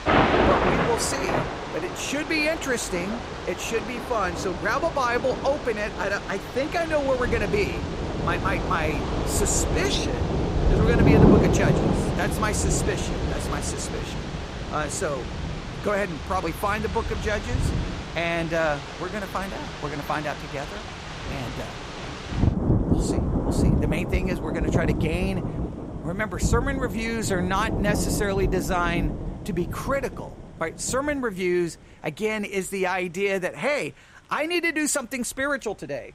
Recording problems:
rain or running water; very loud; throughout; as loud as the speech

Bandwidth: 15.5 kHz